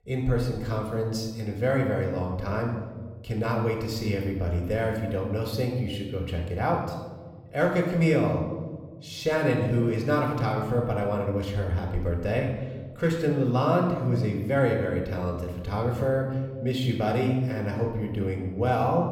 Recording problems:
room echo; noticeable; dies away in 1.2 s
off-mic speech; somewhat distant

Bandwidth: 16 kHz